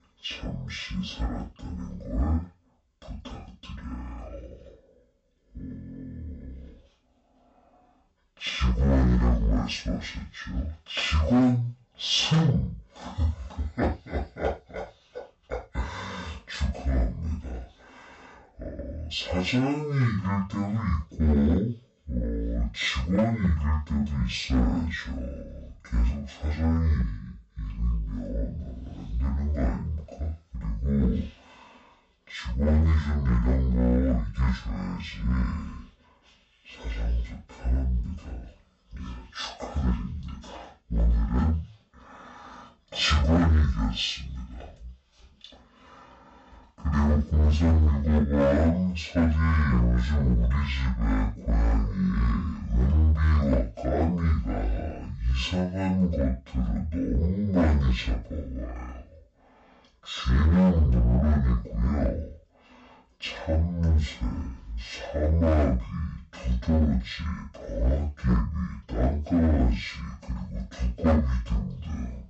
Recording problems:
off-mic speech; far
wrong speed and pitch; too slow and too low; 0.5 times normal speed
room echo; slight; dies away in 0.3 s
distortion; slight; 4% of the sound clipped

